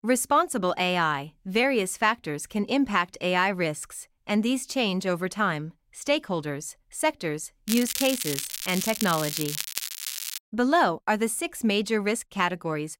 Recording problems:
crackling; loud; from 7.5 to 10 s; 4 dB below the speech

